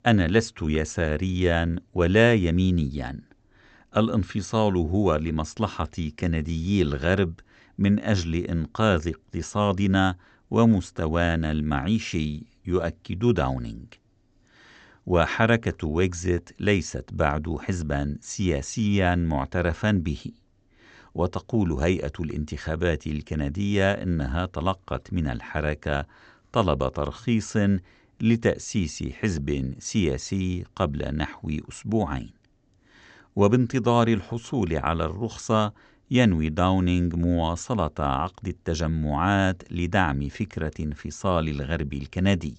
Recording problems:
high frequencies cut off; noticeable; nothing above 8 kHz

